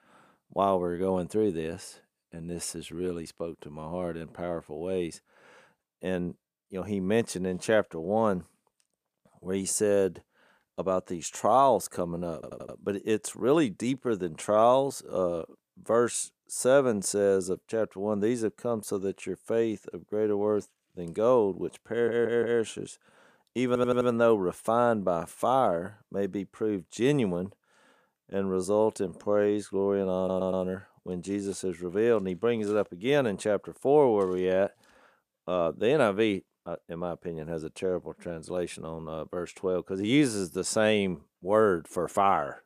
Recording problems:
audio stuttering; 4 times, first at 12 s

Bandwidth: 15 kHz